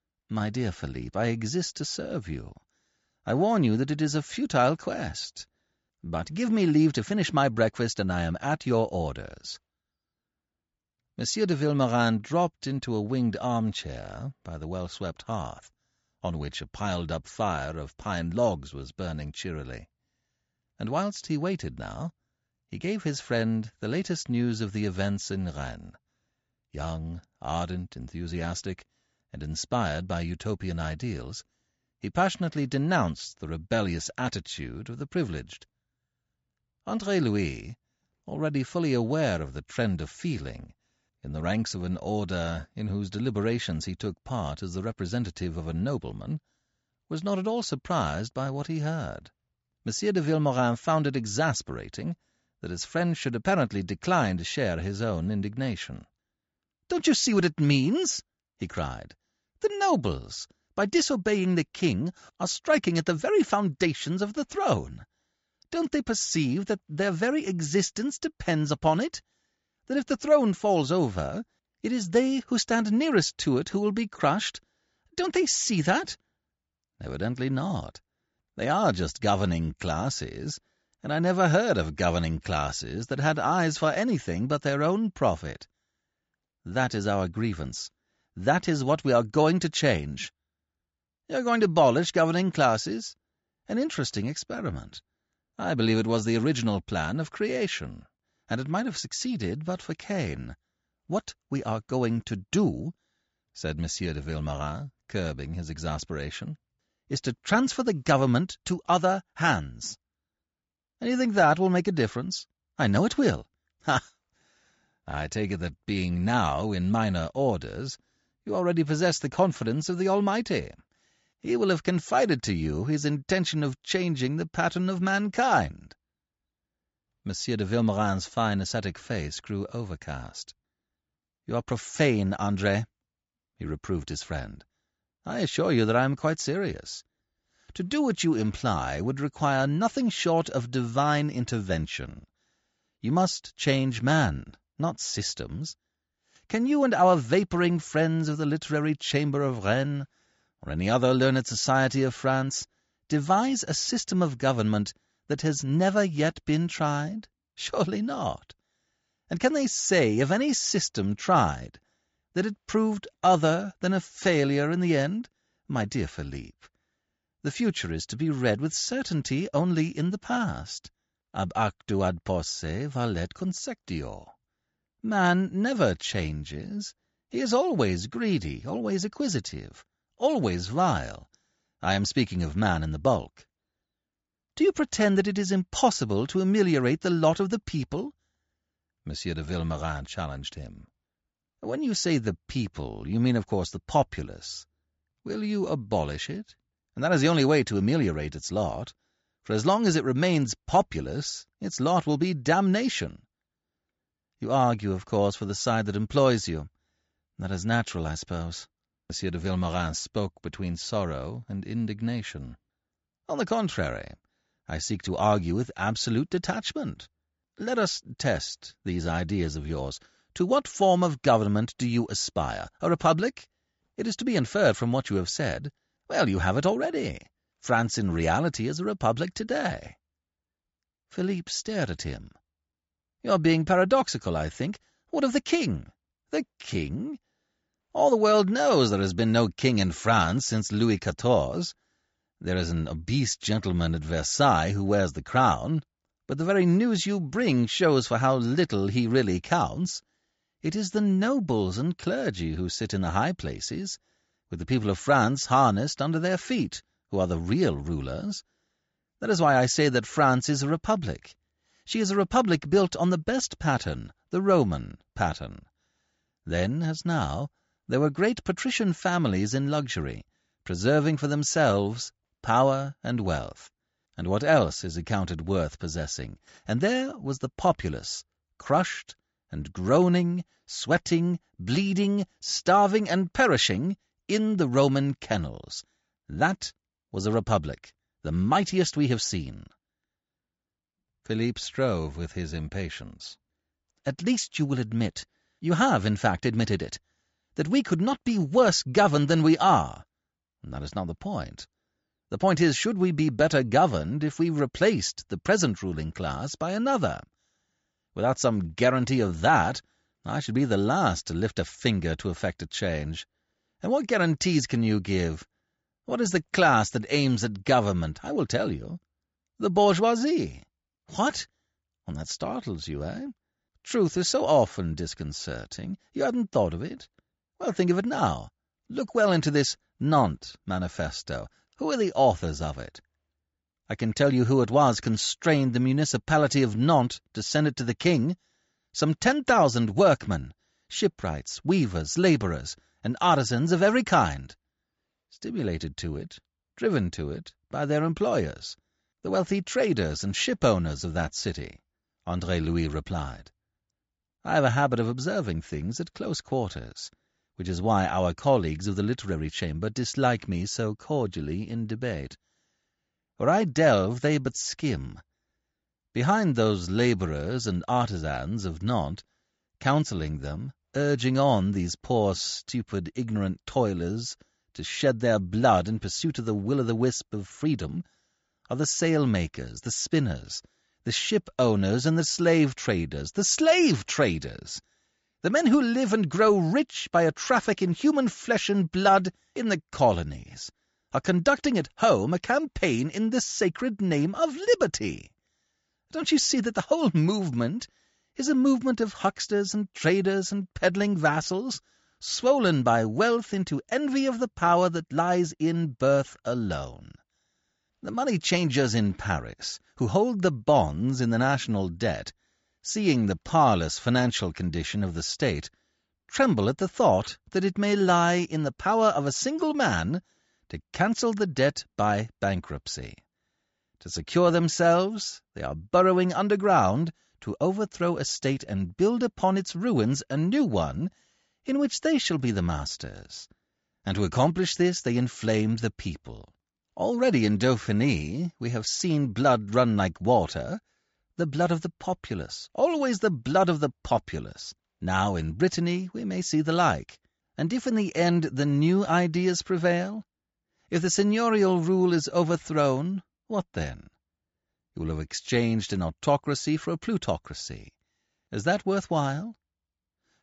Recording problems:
high frequencies cut off; noticeable; nothing above 8 kHz

